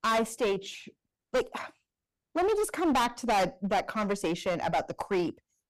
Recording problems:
distortion; heavy; 13% of the sound clipped

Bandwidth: 15.5 kHz